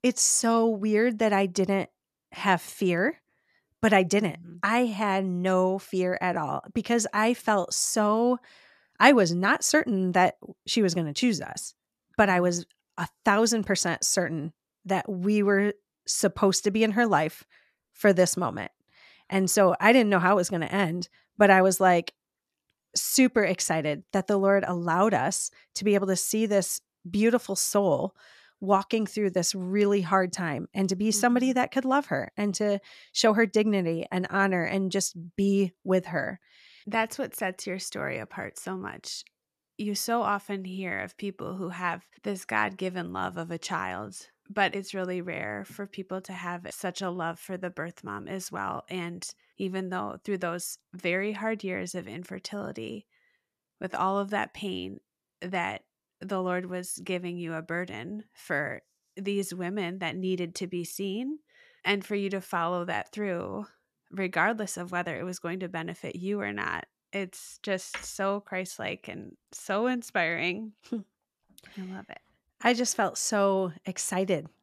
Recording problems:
none

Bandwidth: 14 kHz